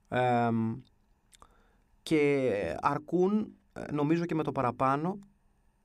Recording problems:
none

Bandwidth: 15.5 kHz